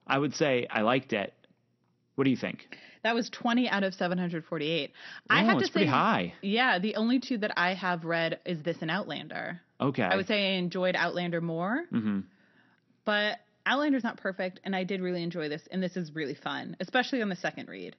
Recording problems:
garbled, watery; slightly; nothing above 6 kHz

